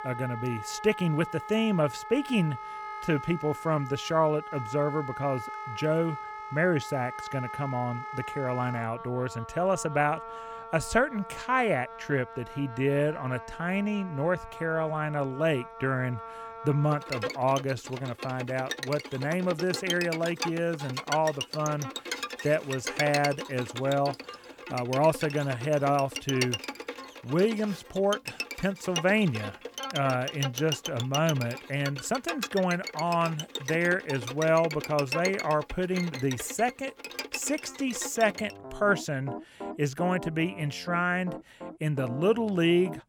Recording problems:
background music; loud; throughout; 9 dB below the speech

